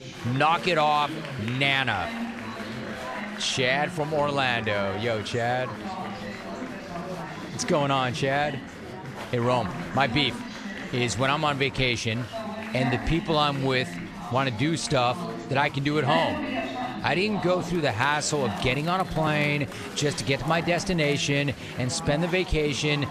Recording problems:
chatter from many people; loud; throughout; 9 dB below the speech

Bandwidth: 14 kHz